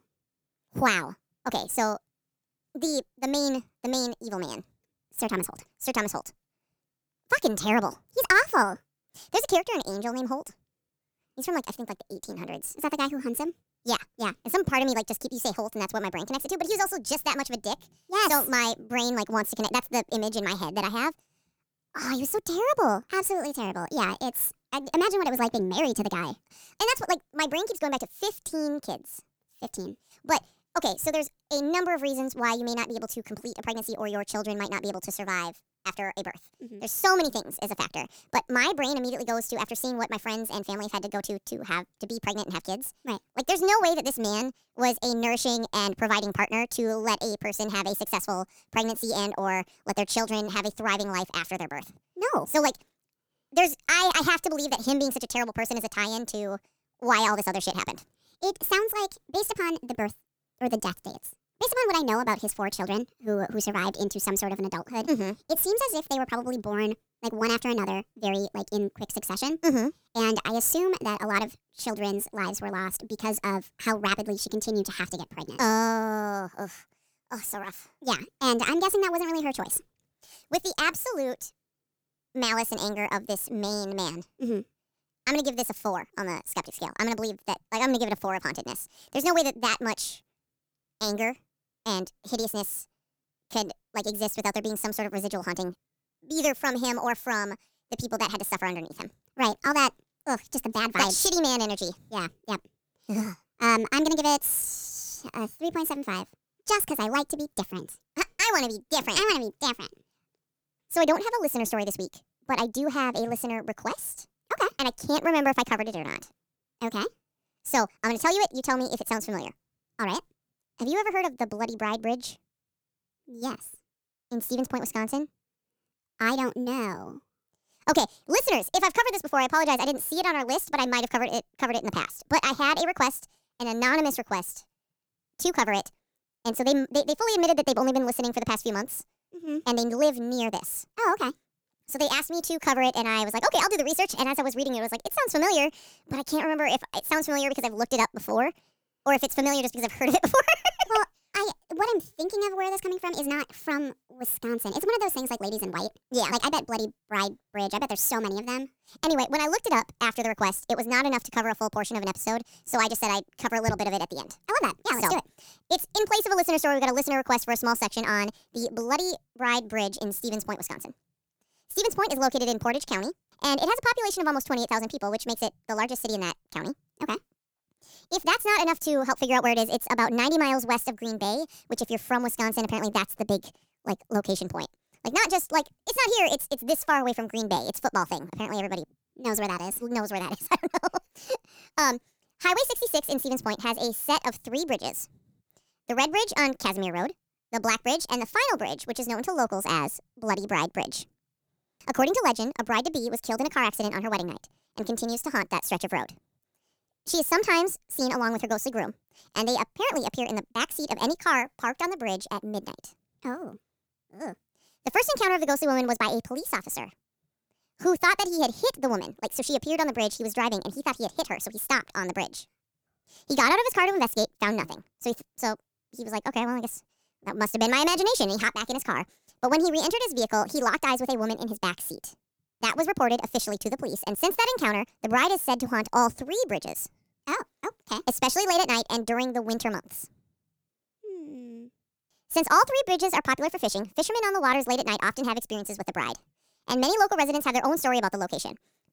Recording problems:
wrong speed and pitch; too fast and too high; 1.5 times normal speed

